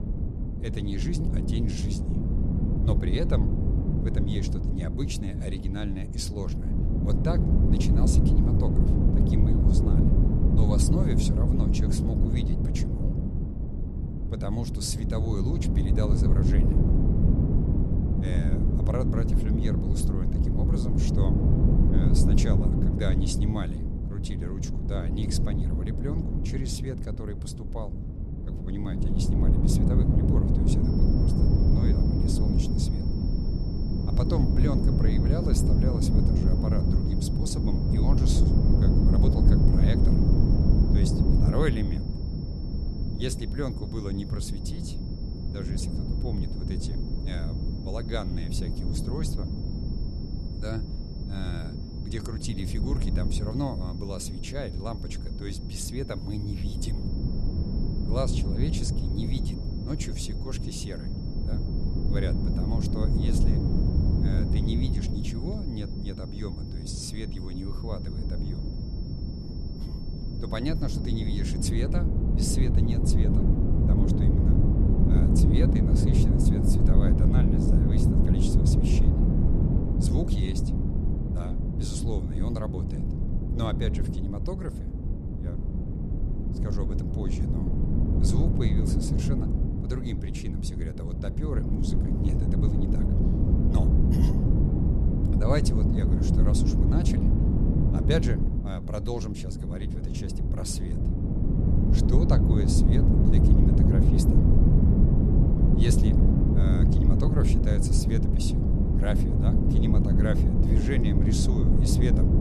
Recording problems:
wind noise on the microphone; heavy; 2 dB above the speech
high-pitched whine; noticeable; from 31 s to 1:12; 5.5 kHz, 15 dB below the speech

